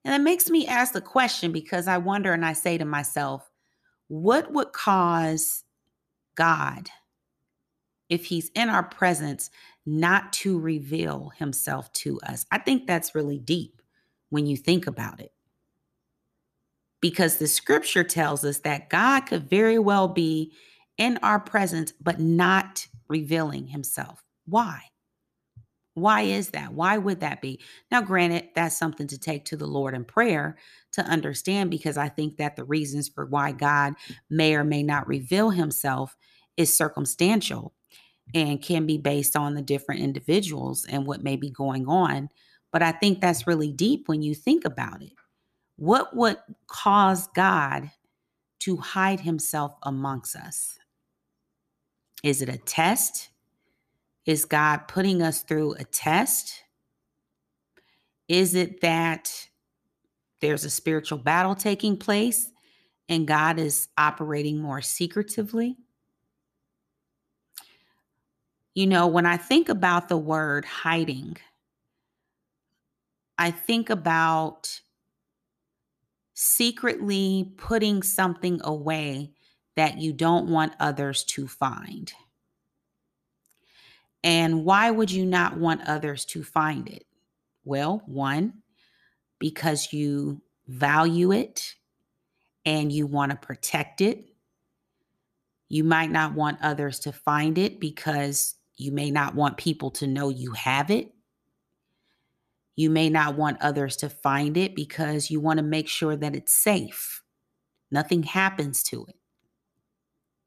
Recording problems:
none

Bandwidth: 14.5 kHz